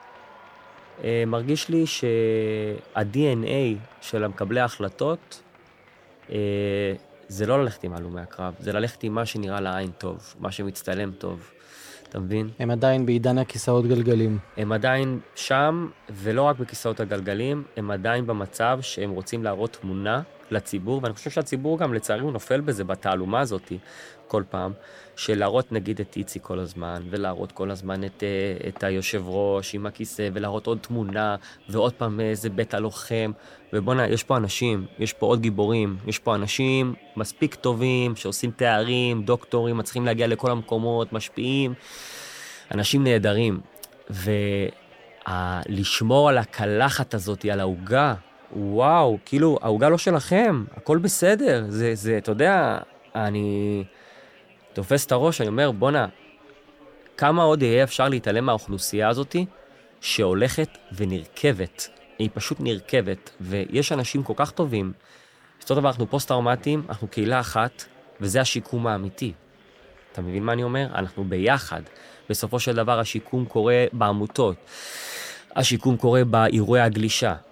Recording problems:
chatter from many people; faint; throughout; 25 dB below the speech

